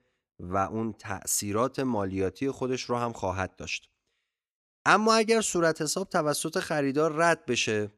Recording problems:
none

